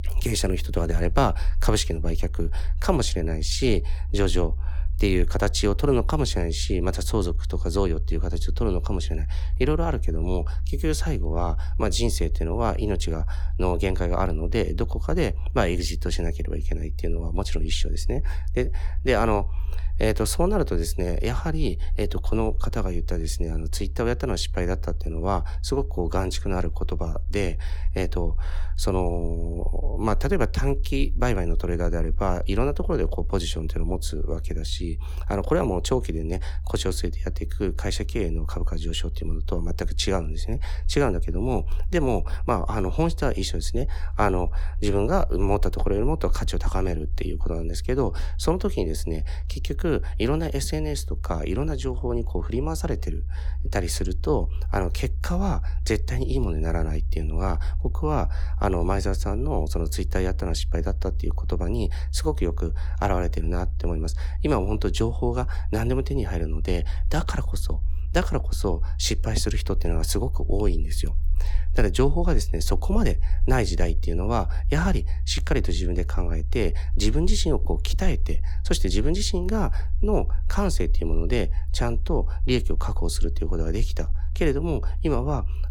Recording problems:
low rumble; faint; throughout; 20 dB below the speech

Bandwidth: 17.5 kHz